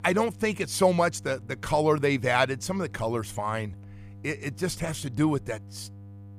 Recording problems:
electrical hum; faint; throughout; 50 Hz, 30 dB below the speech

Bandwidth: 15 kHz